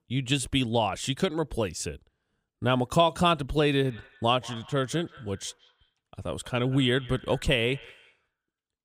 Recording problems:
echo of what is said; faint; from 4 s on; 180 ms later, 20 dB below the speech

